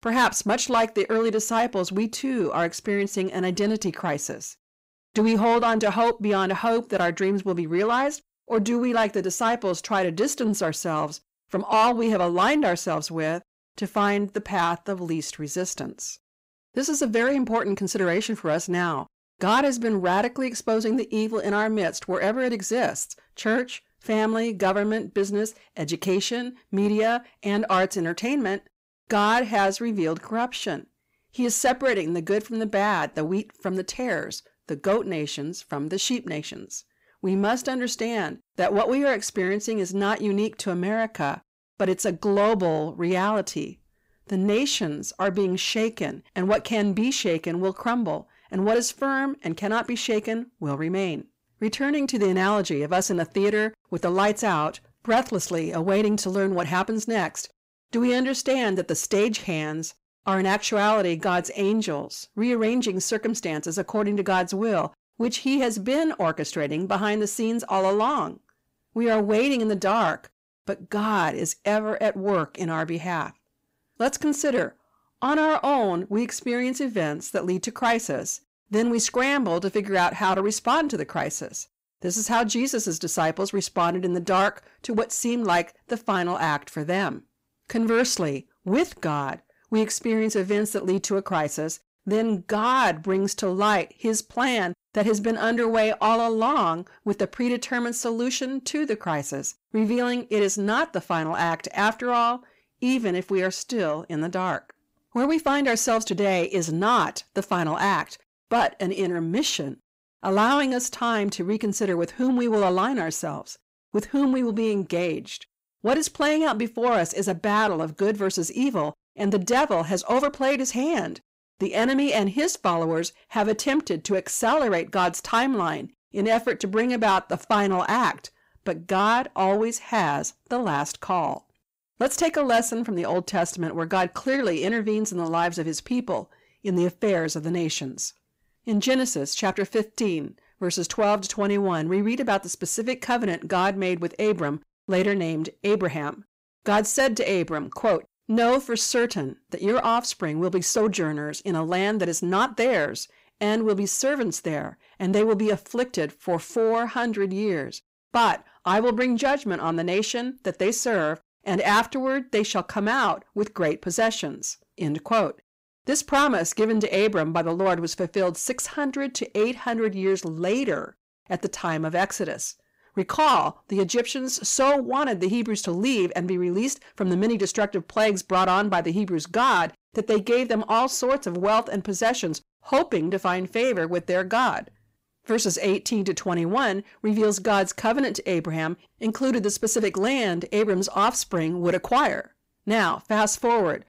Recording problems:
distortion; slight; 10 dB below the speech

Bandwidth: 15.5 kHz